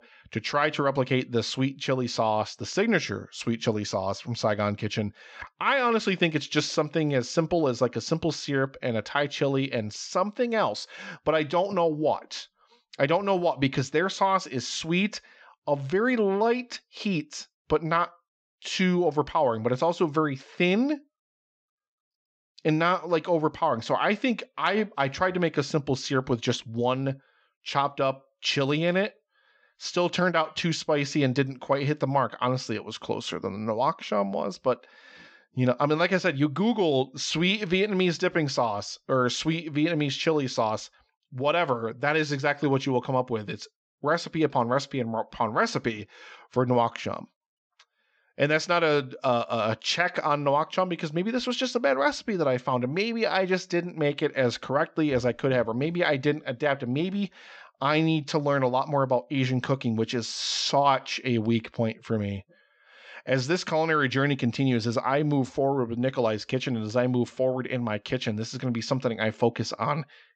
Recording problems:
high frequencies cut off; noticeable; nothing above 8 kHz

